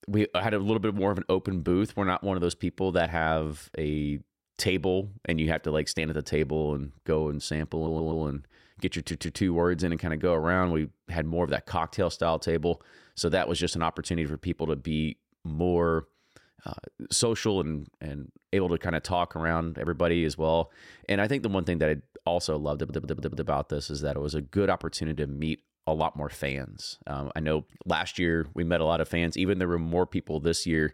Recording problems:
audio stuttering; at 8 s, at 9 s and at 23 s

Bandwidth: 16 kHz